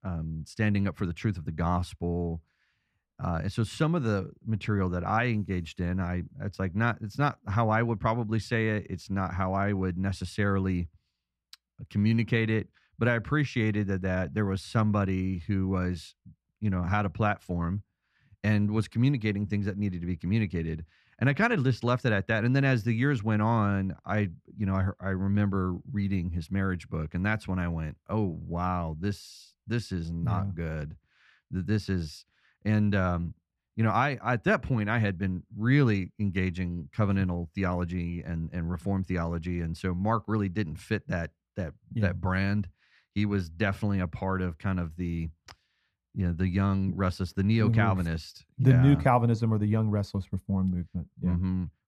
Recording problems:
muffled; slightly; fading above 3 kHz

